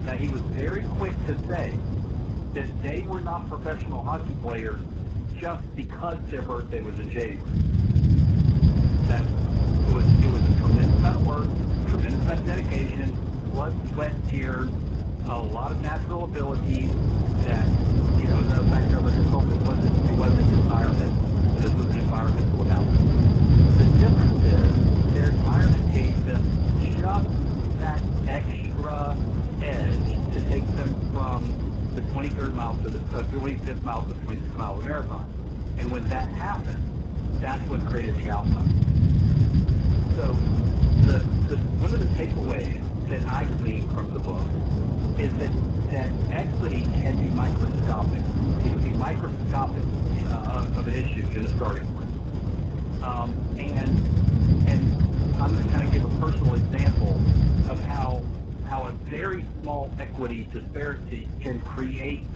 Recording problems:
garbled, watery; badly
low rumble; loud; throughout; 1 dB below the speech

